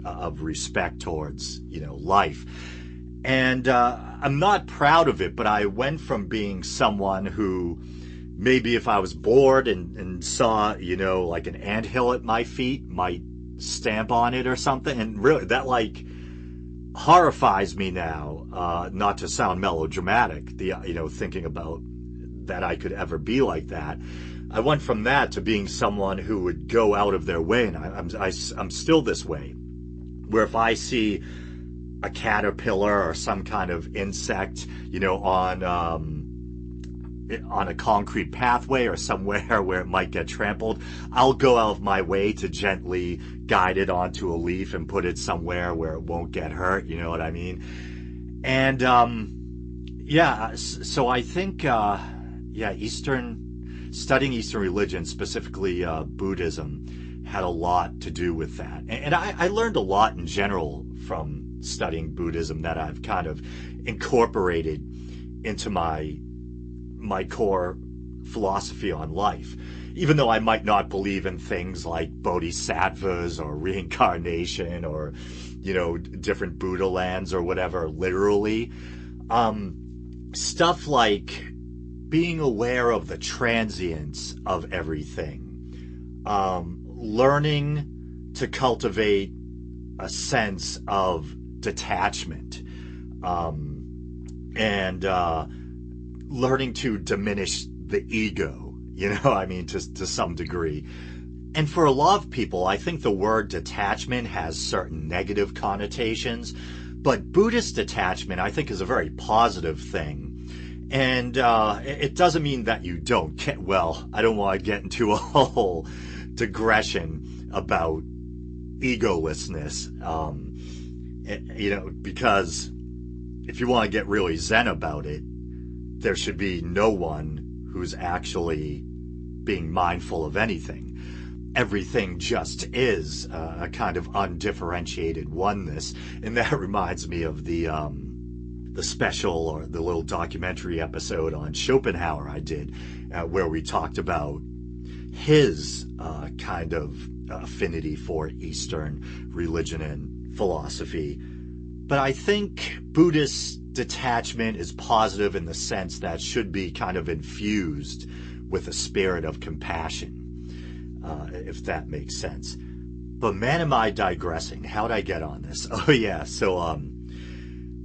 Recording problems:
garbled, watery; slightly; nothing above 8 kHz
electrical hum; faint; throughout; 60 Hz, 20 dB below the speech

